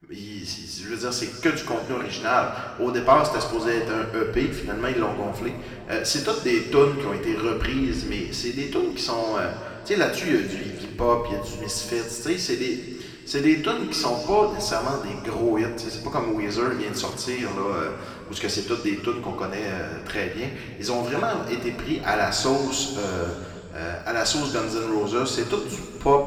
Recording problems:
room echo; noticeable; dies away in 2 s
off-mic speech; somewhat distant

